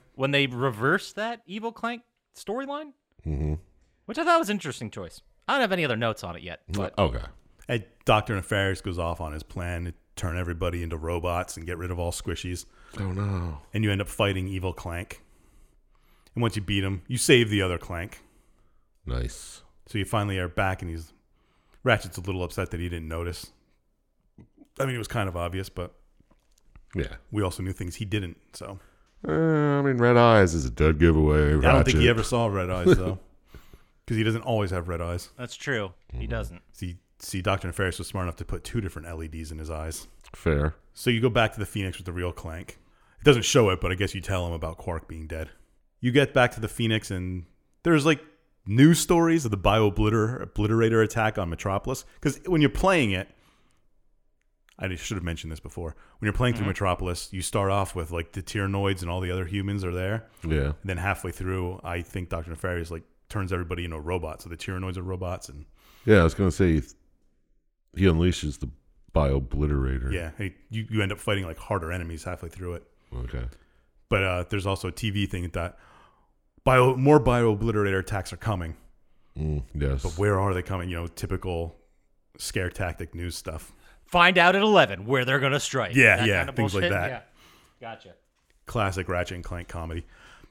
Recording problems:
none

